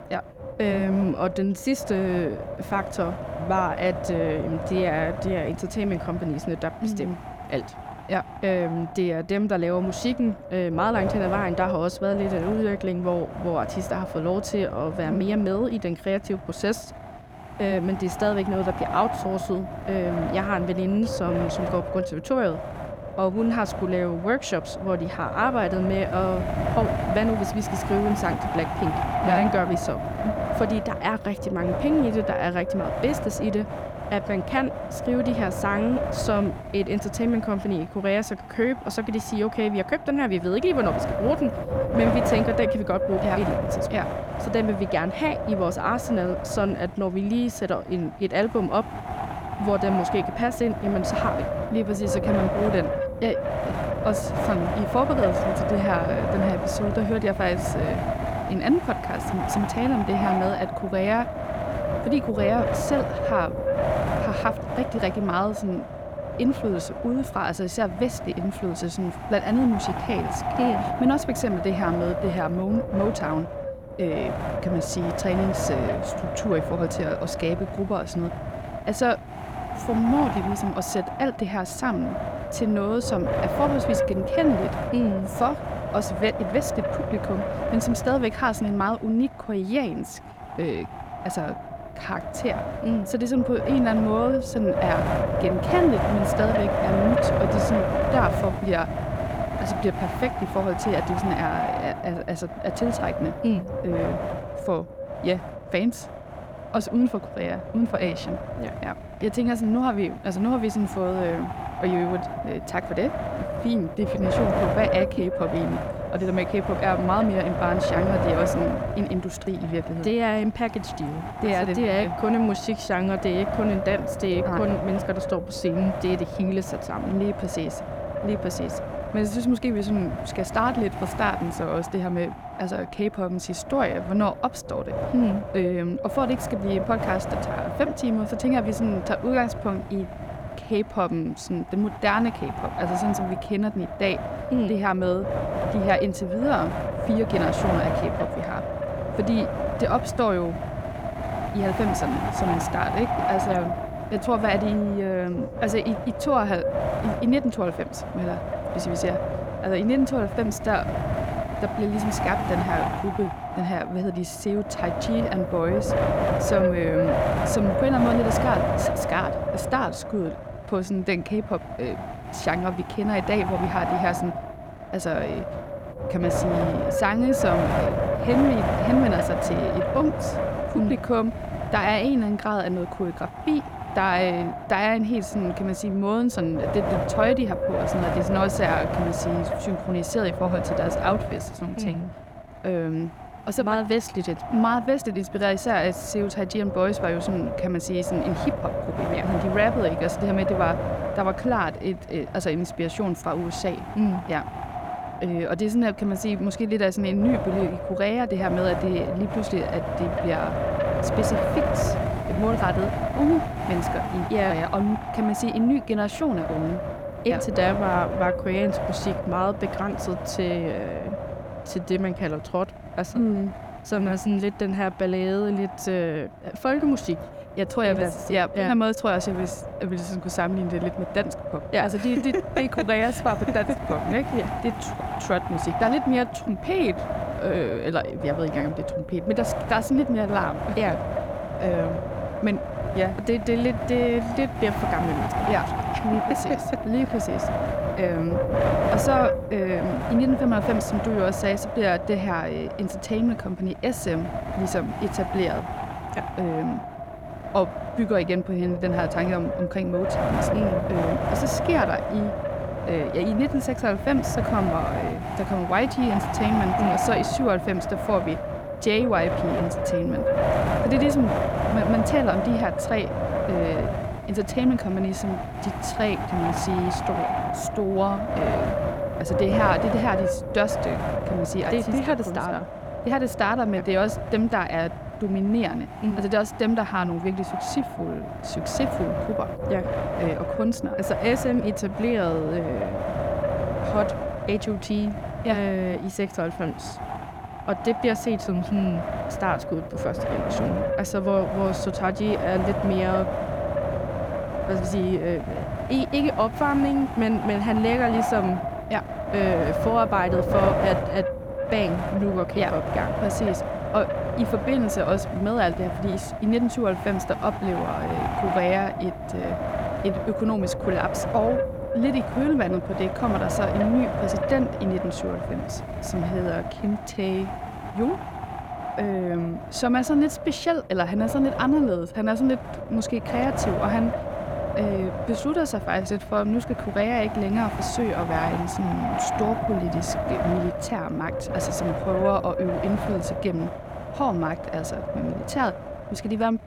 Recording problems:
wind noise on the microphone; heavy; 2 dB below the speech

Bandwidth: 18 kHz